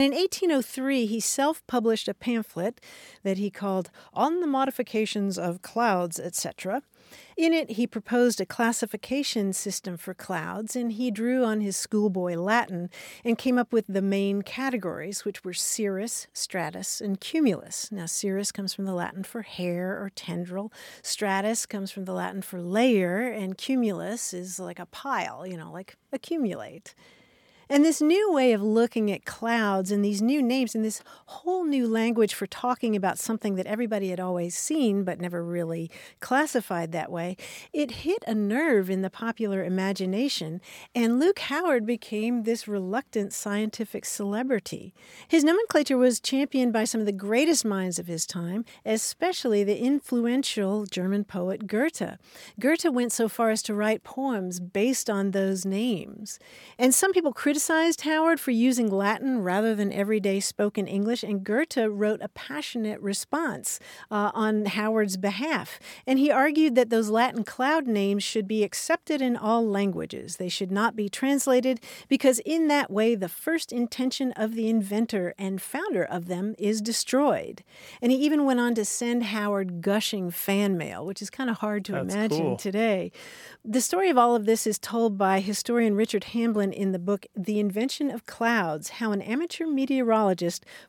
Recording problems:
abrupt cut into speech; at the start

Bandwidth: 17 kHz